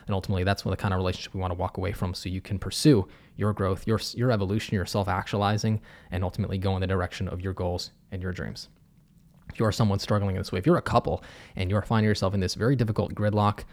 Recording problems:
none

